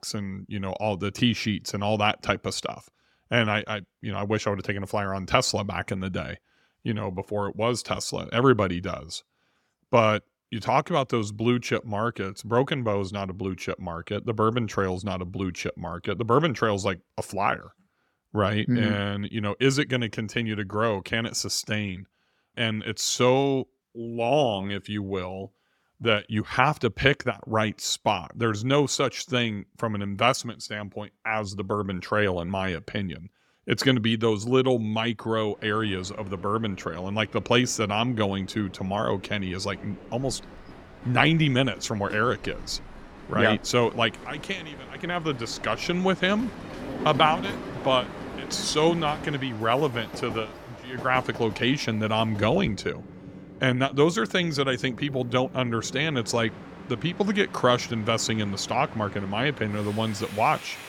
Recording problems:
train or aircraft noise; noticeable; from 36 s on; 15 dB below the speech

